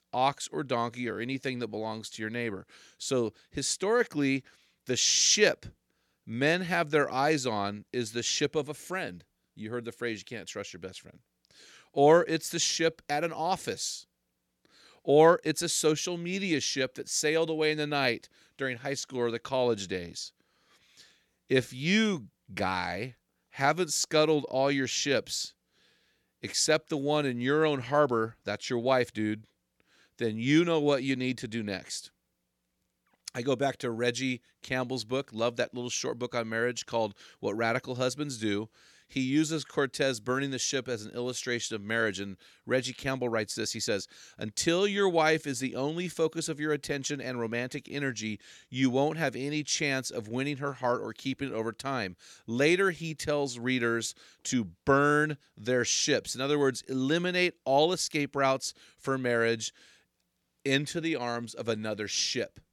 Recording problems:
none

